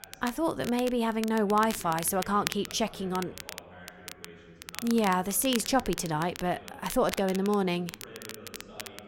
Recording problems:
crackle, like an old record; noticeable; 15 dB below the speech
voice in the background; faint; throughout; 20 dB below the speech

